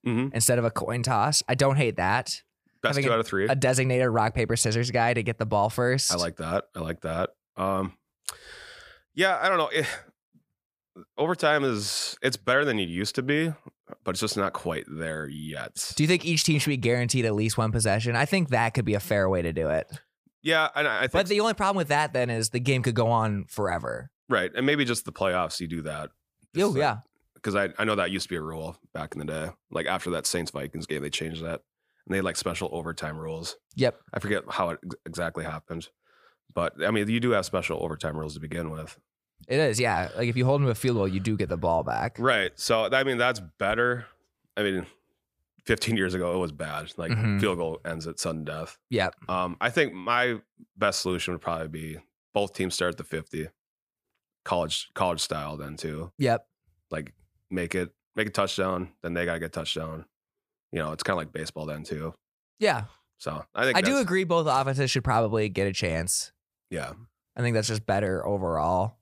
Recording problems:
none

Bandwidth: 15 kHz